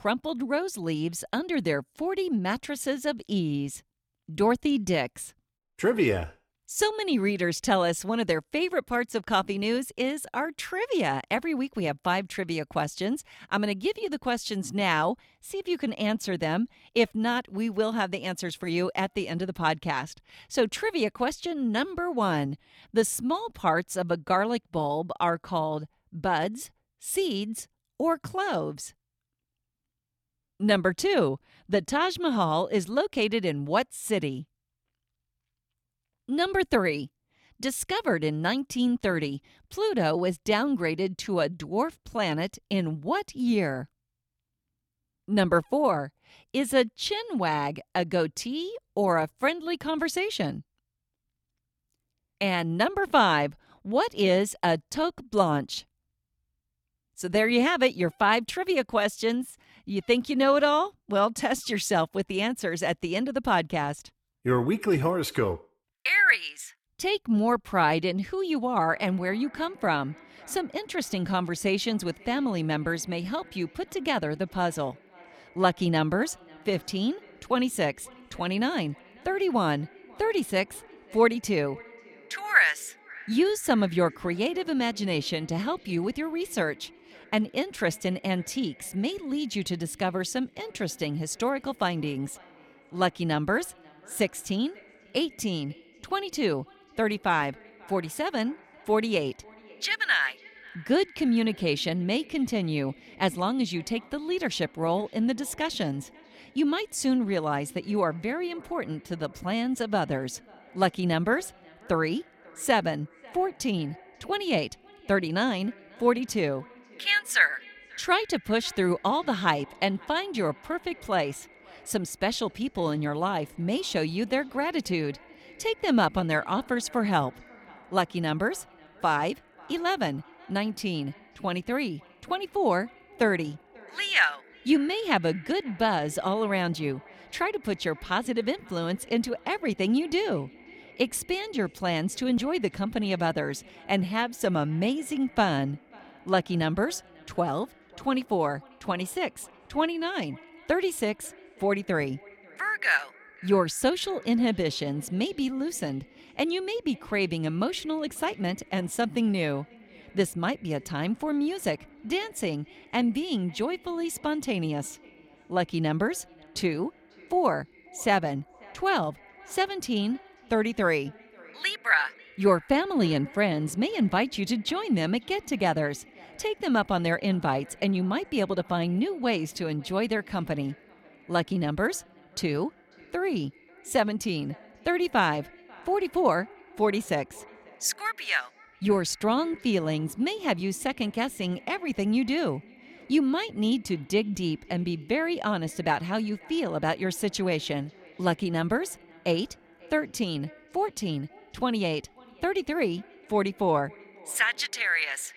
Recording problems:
echo of what is said; faint; from 1:09 on; 540 ms later, 25 dB below the speech

